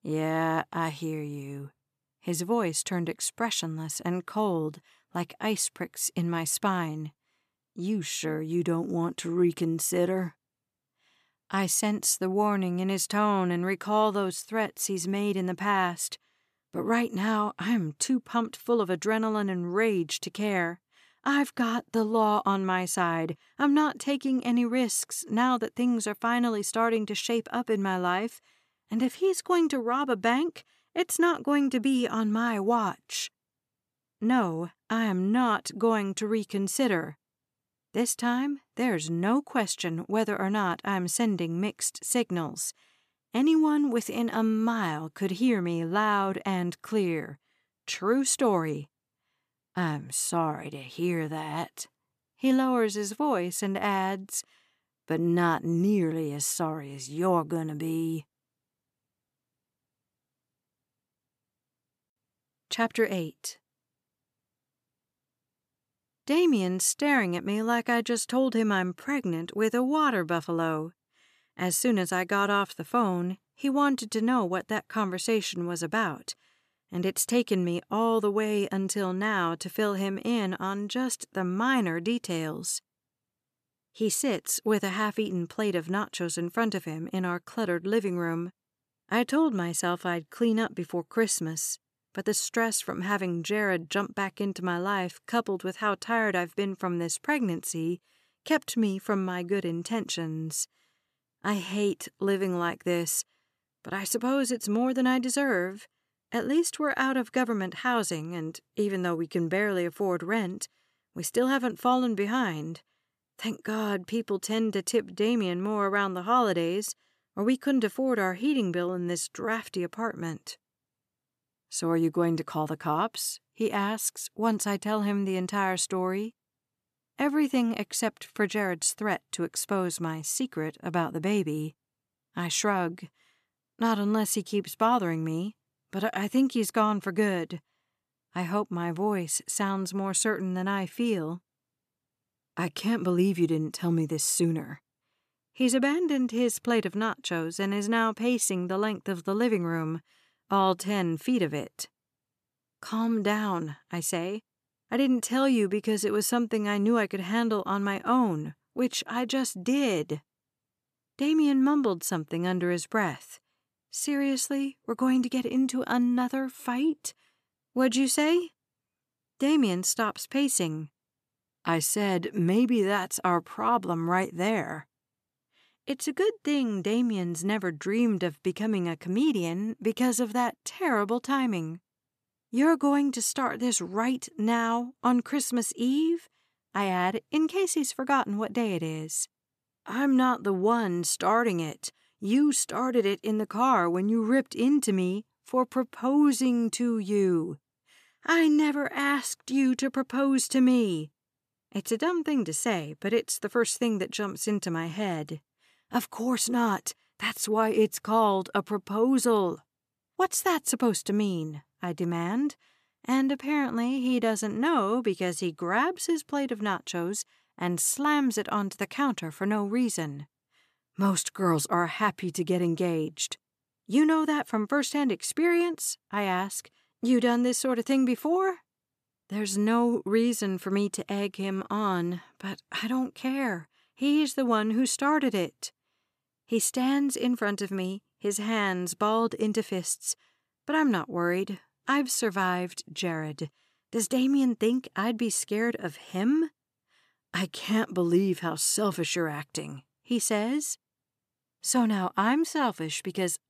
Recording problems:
none

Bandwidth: 14.5 kHz